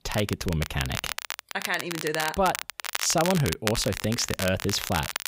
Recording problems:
crackle, like an old record; loud; 5 dB below the speech

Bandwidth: 15.5 kHz